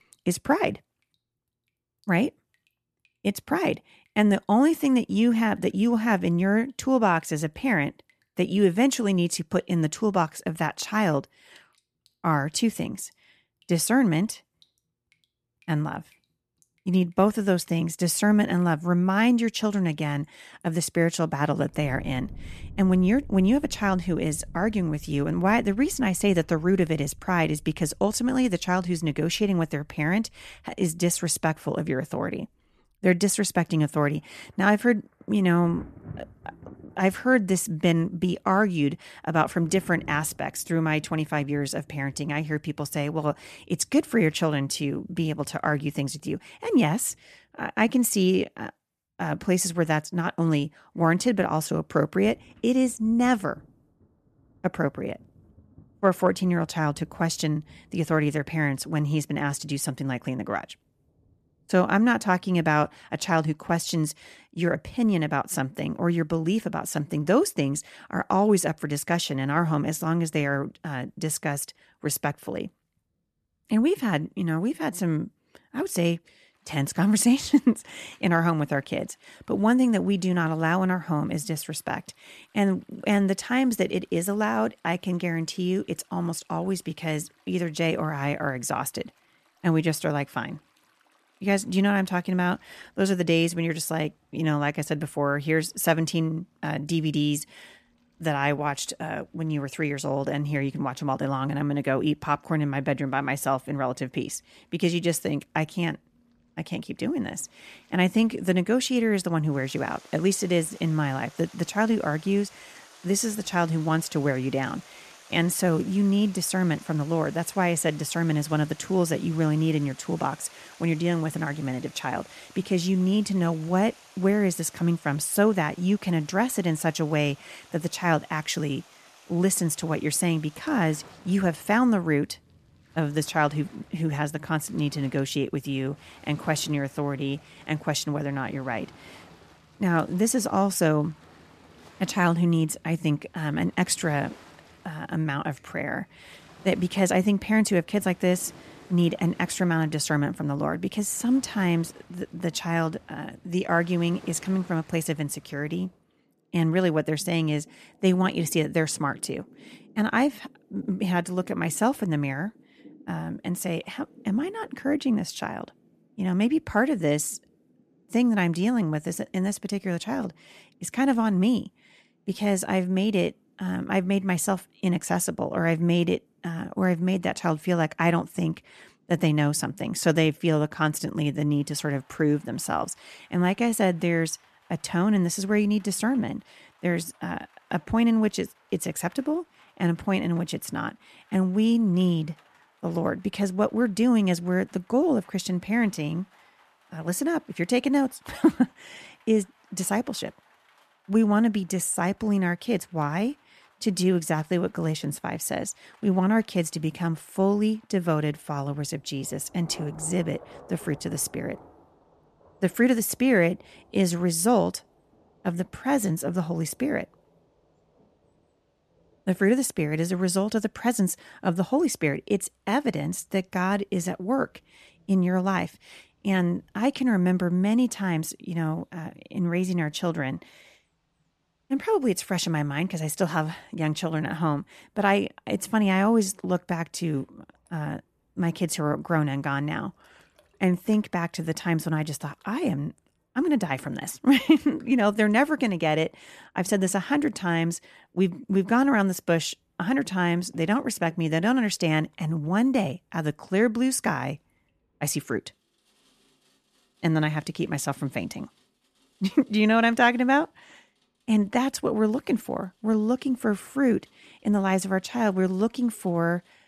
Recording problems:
rain or running water; faint; throughout; 25 dB below the speech

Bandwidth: 14 kHz